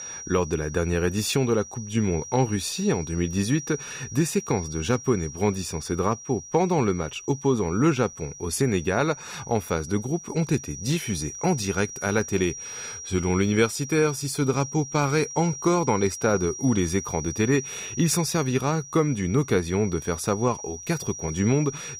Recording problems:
high-pitched whine; noticeable; throughout; 5.5 kHz, 10 dB below the speech

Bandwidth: 15.5 kHz